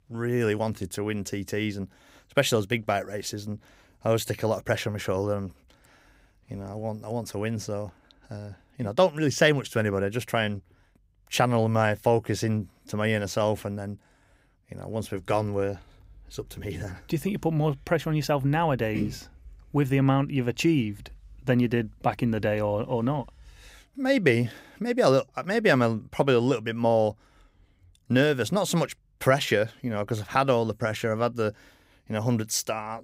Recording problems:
none

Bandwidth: 15.5 kHz